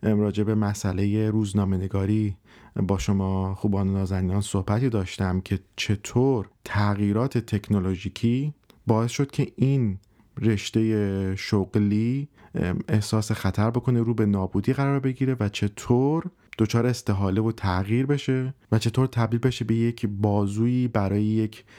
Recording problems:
none

